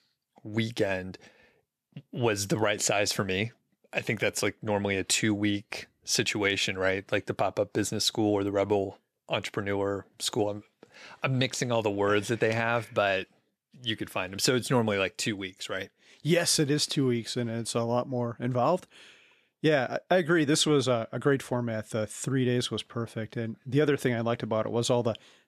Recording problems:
none

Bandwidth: 14 kHz